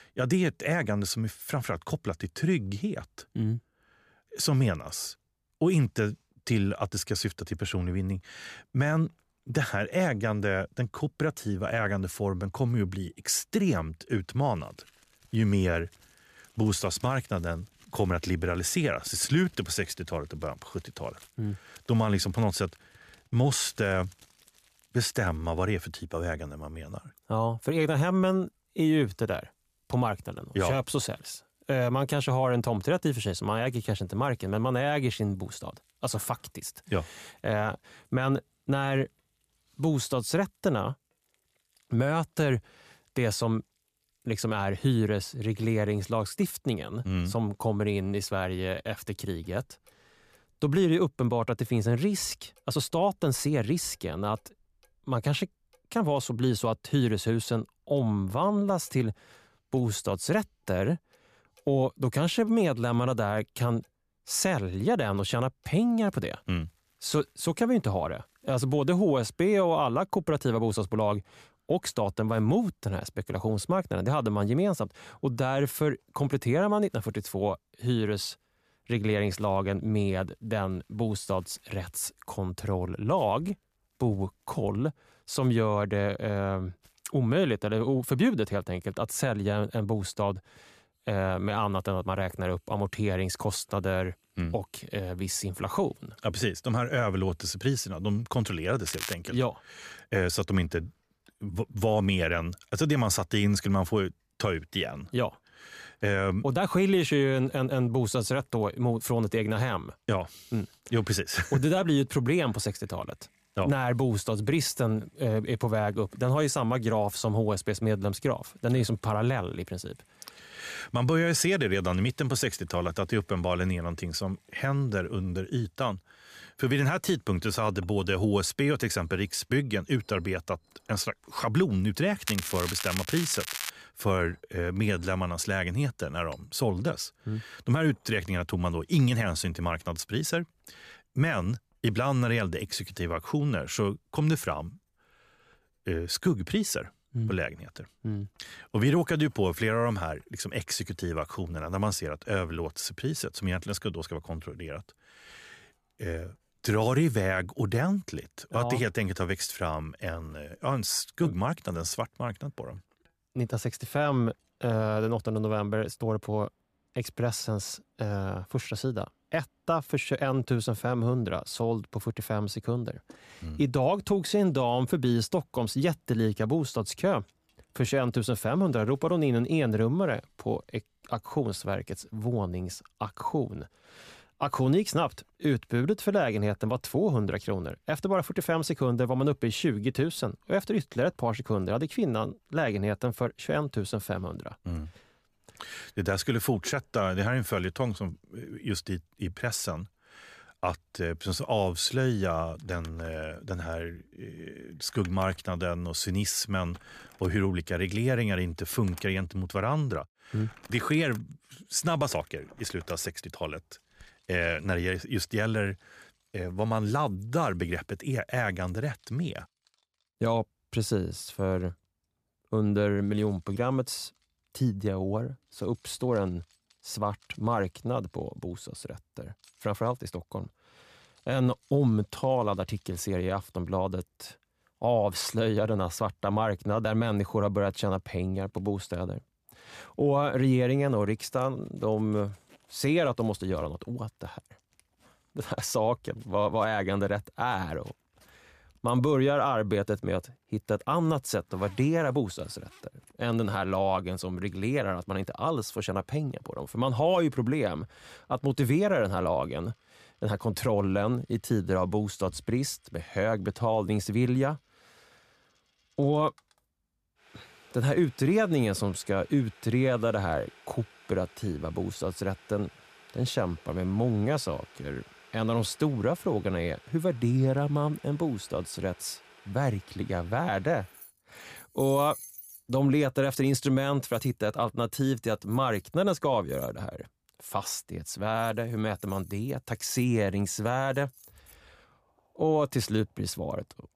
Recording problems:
crackling; loud; at 1:39 and from 2:12 to 2:14; 6 dB below the speech
household noises; faint; throughout; 25 dB below the speech

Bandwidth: 14.5 kHz